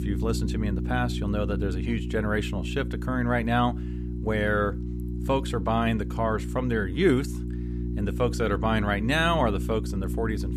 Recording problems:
electrical hum; noticeable; throughout; 60 Hz, 15 dB below the speech

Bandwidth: 14.5 kHz